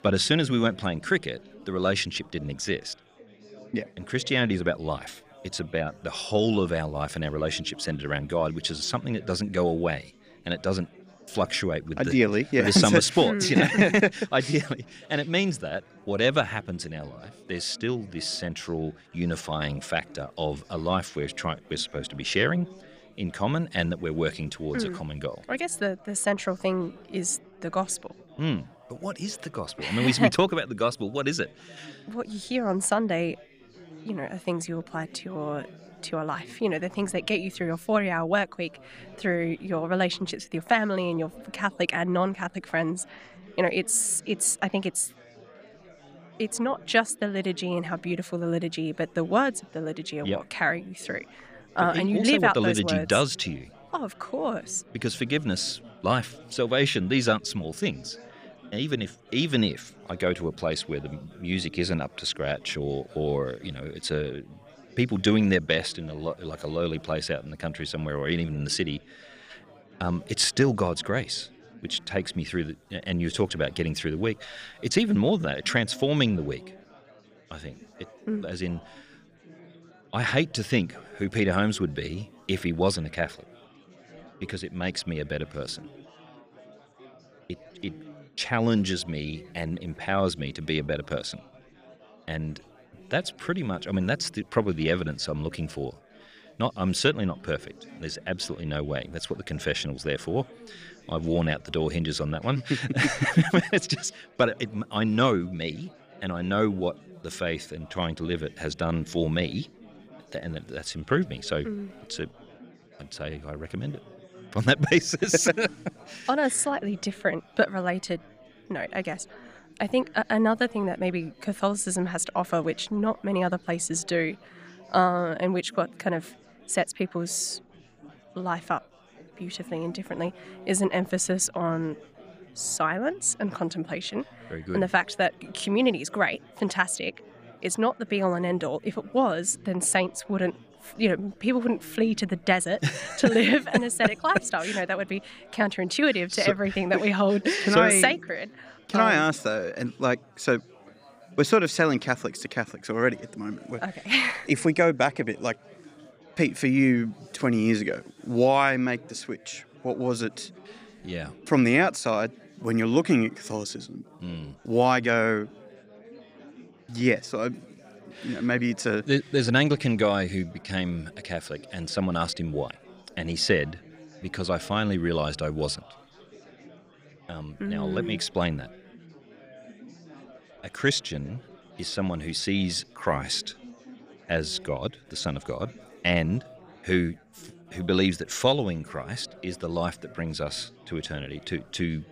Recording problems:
chatter from many people; faint; throughout; 25 dB below the speech

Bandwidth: 14.5 kHz